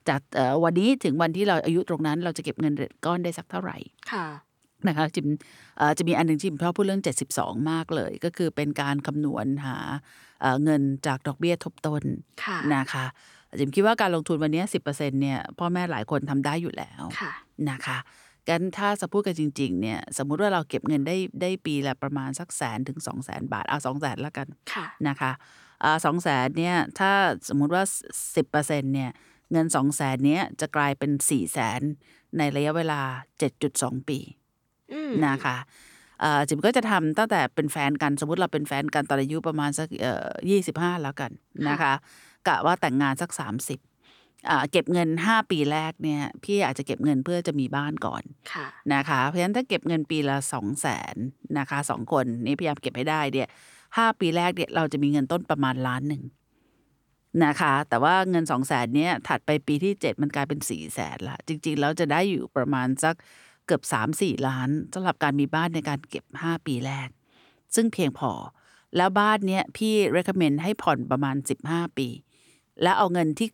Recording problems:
none

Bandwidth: 18.5 kHz